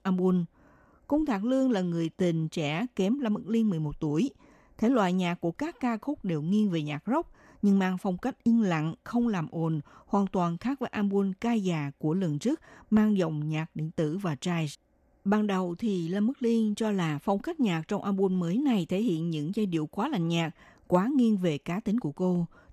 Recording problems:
none

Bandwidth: 14 kHz